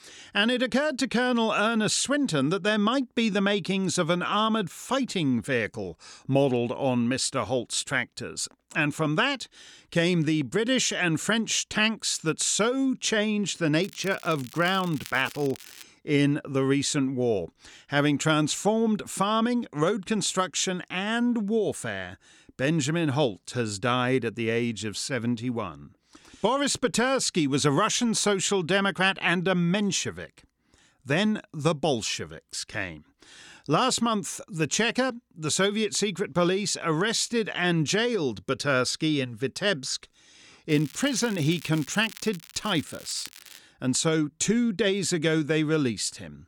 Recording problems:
crackling; noticeable; from 14 to 16 s and from 41 to 44 s; 20 dB below the speech

